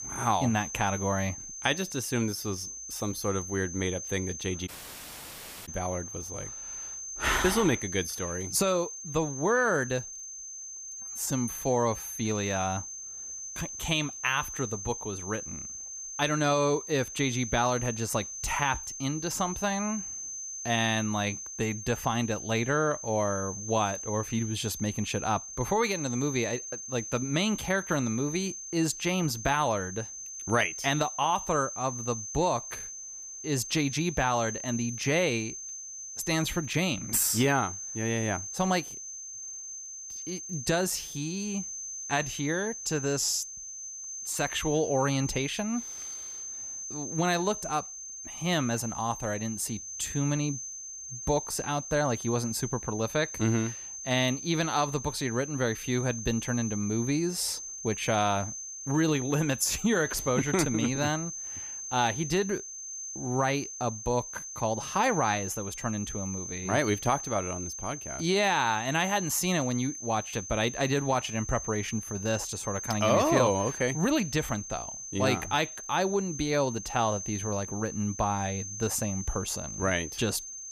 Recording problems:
high-pitched whine; loud; throughout; 6.5 kHz, 7 dB below the speech
audio cutting out; at 4.5 s for 1 s

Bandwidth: 15 kHz